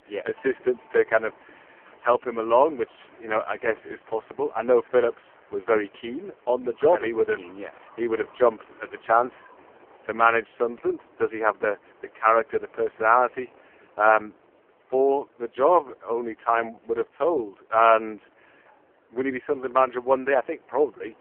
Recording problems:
phone-call audio; poor line
wind in the background; faint; throughout; 30 dB below the speech

